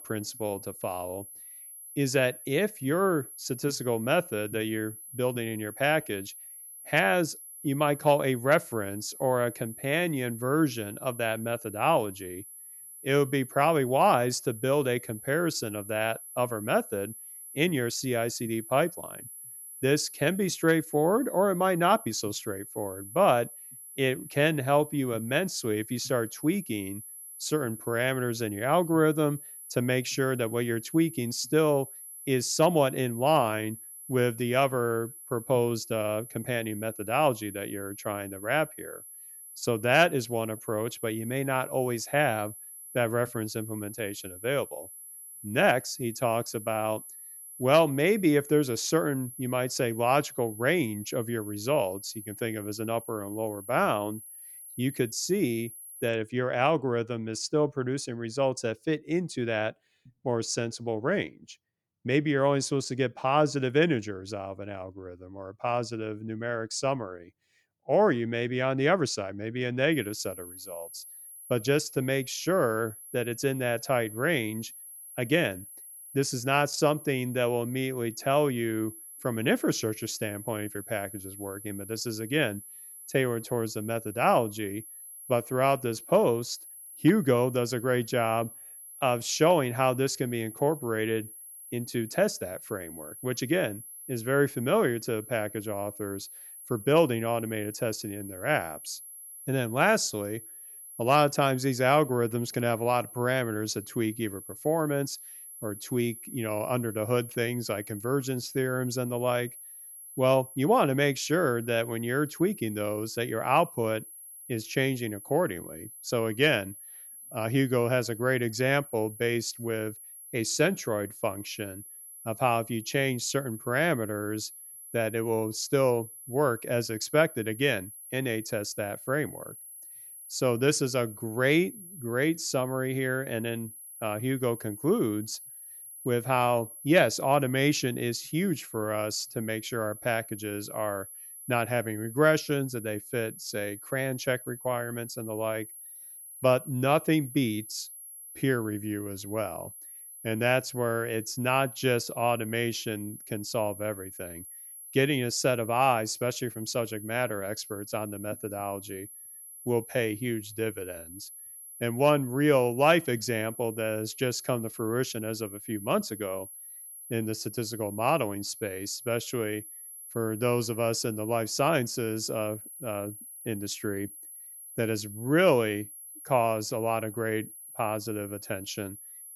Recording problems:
high-pitched whine; noticeable; until 56 s and from 1:10 on; 11 kHz, 15 dB below the speech

